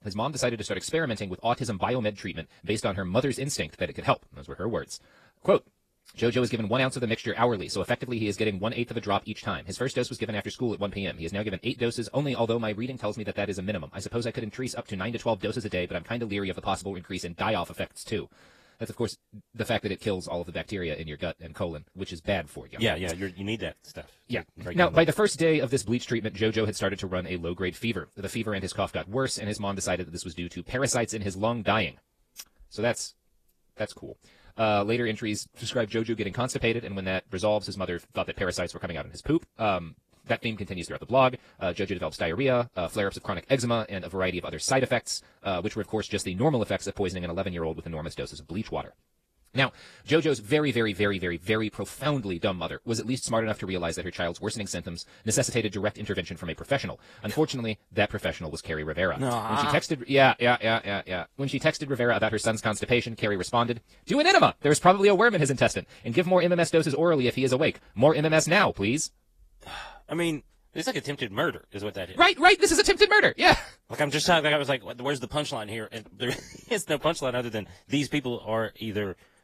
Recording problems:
wrong speed, natural pitch; too fast; 1.5 times normal speed
garbled, watery; slightly; nothing above 14.5 kHz

